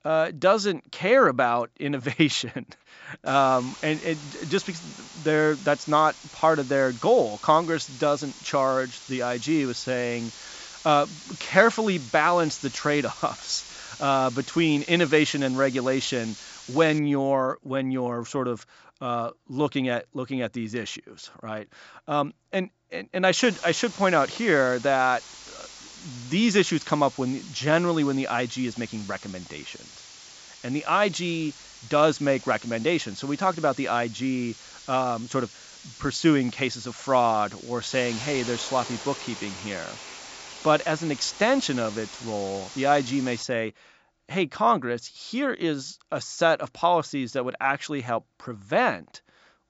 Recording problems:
high frequencies cut off; noticeable; nothing above 8 kHz
hiss; noticeable; from 3.5 to 17 s and from 23 to 43 s; 15 dB below the speech

